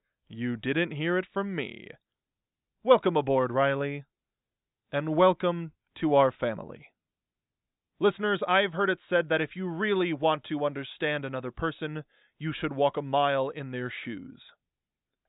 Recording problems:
high frequencies cut off; severe; nothing above 4 kHz

